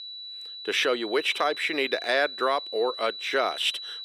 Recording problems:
thin; very; fading below 400 Hz
high-pitched whine; loud; throughout; 4 kHz, 10 dB below the speech

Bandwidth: 15 kHz